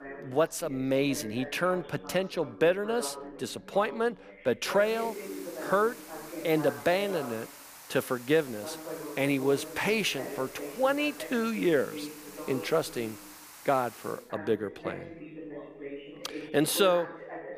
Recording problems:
background chatter; noticeable; throughout; 2 voices, 10 dB below the speech
hiss; noticeable; from 5 to 14 s; 15 dB below the speech

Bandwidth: 15 kHz